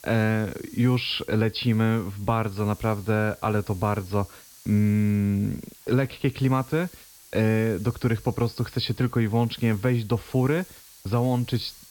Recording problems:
high frequencies cut off; noticeable; nothing above 5.5 kHz
hiss; faint; throughout; 20 dB below the speech

